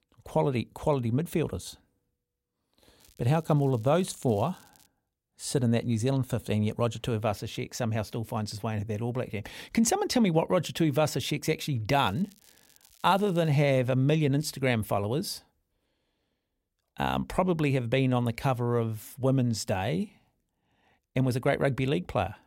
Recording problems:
crackling; faint; from 3 to 5 s and from 12 to 13 s; 30 dB below the speech

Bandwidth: 16 kHz